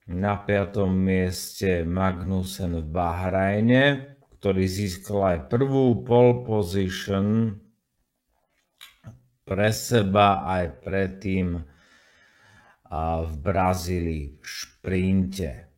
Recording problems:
wrong speed, natural pitch; too slow; 0.5 times normal speed

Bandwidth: 16 kHz